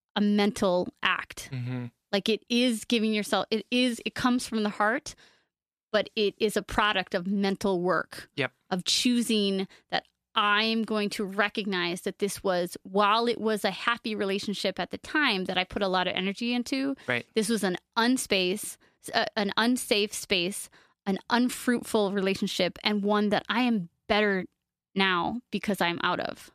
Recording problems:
none

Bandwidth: 14.5 kHz